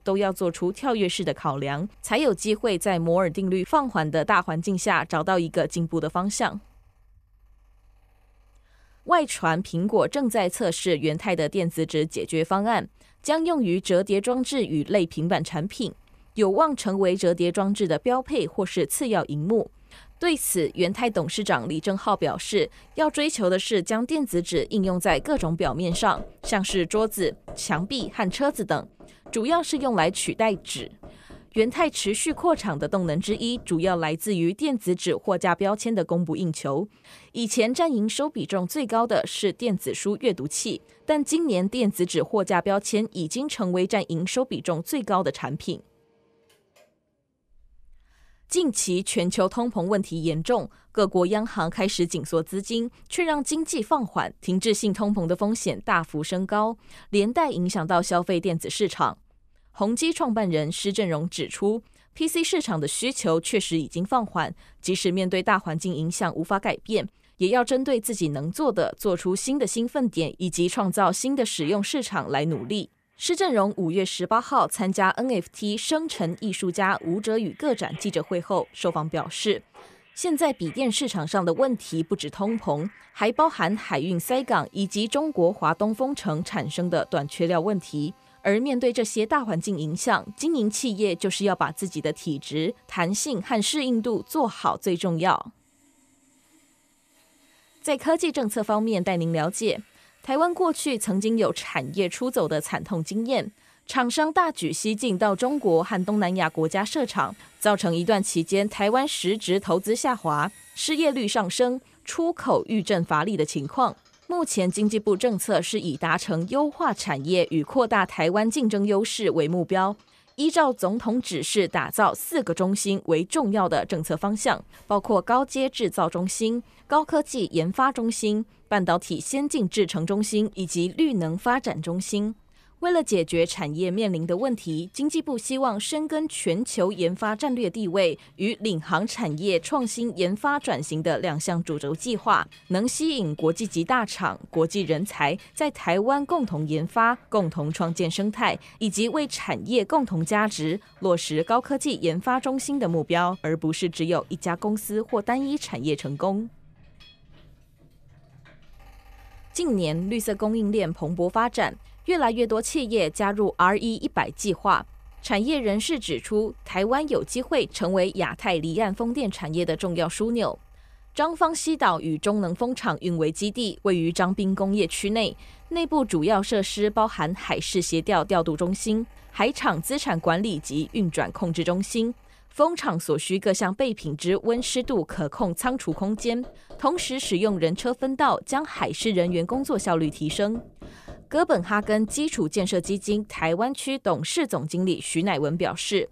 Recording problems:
machinery noise; faint; throughout; 30 dB below the speech

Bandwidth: 14.5 kHz